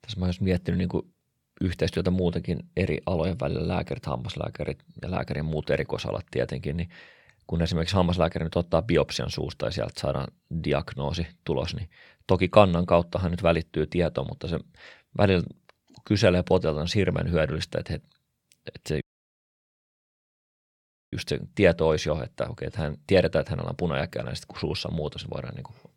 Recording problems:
audio cutting out; at 19 s for 2 s

